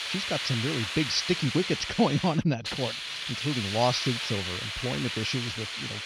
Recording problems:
high frequencies cut off; noticeable; nothing above 6 kHz
hiss; loud; throughout; 3 dB below the speech

